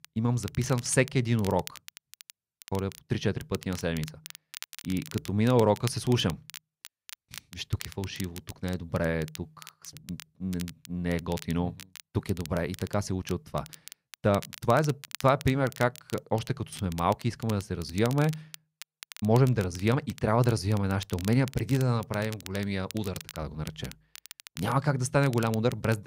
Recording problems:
crackle, like an old record; noticeable; 15 dB below the speech

